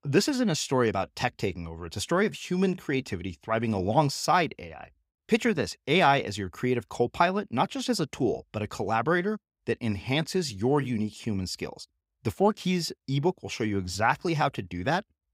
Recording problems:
none

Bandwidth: 15.5 kHz